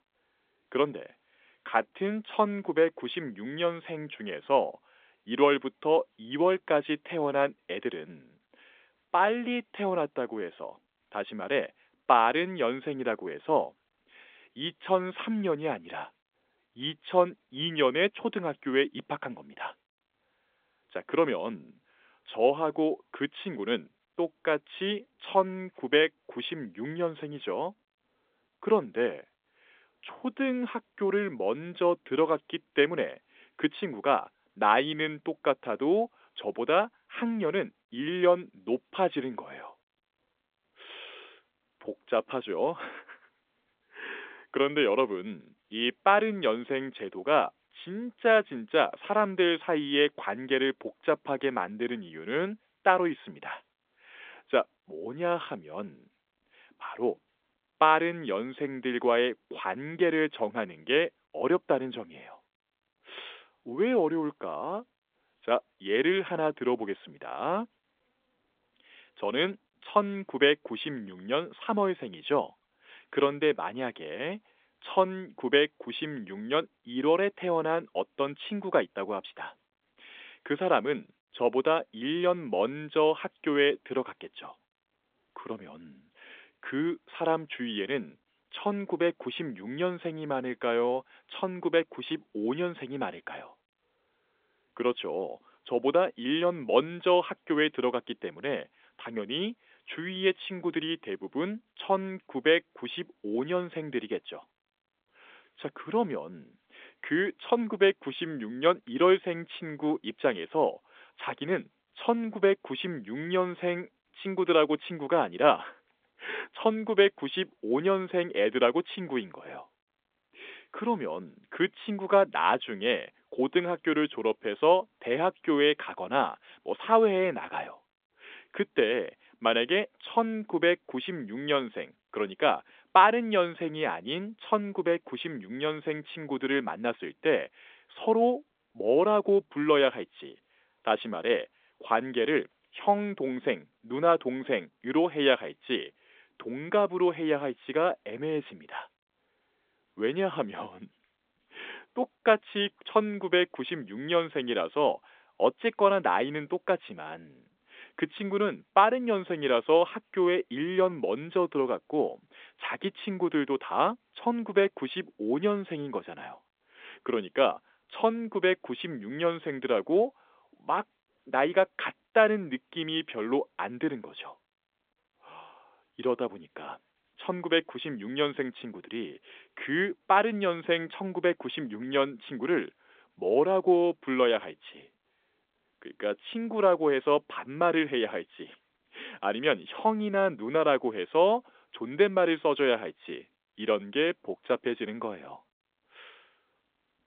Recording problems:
phone-call audio; nothing above 3.5 kHz

